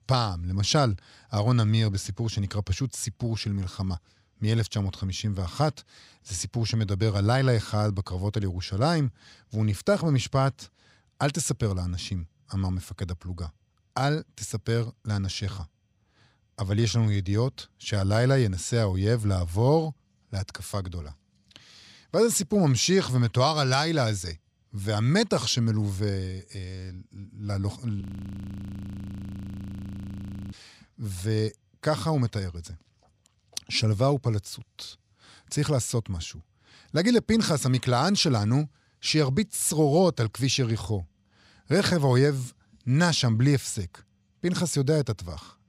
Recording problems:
audio freezing; at 28 s for 2.5 s

